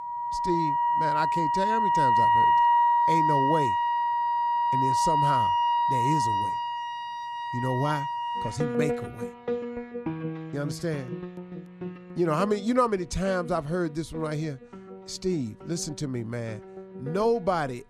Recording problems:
background music; very loud; throughout; 5 dB above the speech

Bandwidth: 13.5 kHz